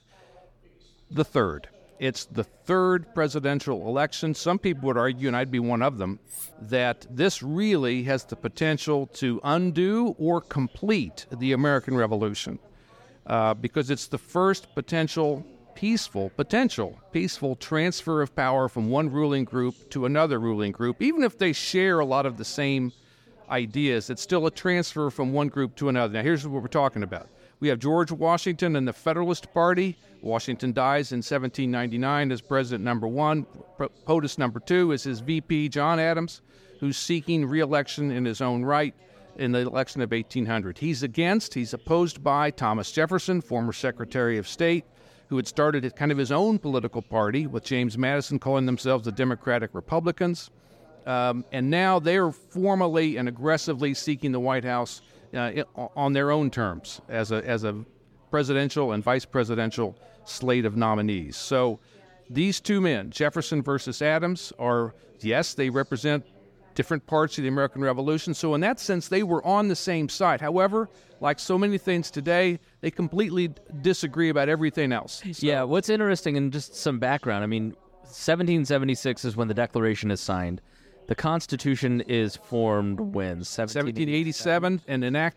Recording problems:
background chatter; faint; throughout; 3 voices, 30 dB below the speech
clattering dishes; faint; at 6.5 s; peak 10 dB below the speech

